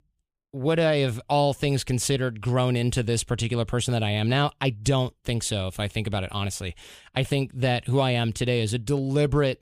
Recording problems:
none

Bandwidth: 15 kHz